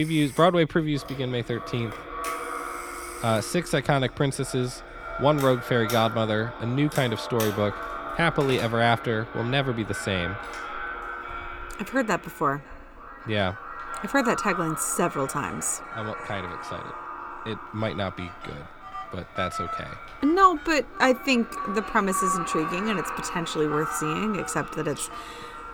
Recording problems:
echo of what is said; strong; throughout; 550 ms later, 9 dB below the speech
alarms or sirens; noticeable; throughout; 15 dB below the speech
abrupt cut into speech; at the start

